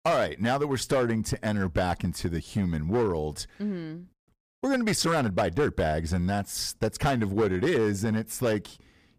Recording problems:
distortion; slight; 7% of the sound clipped

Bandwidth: 15 kHz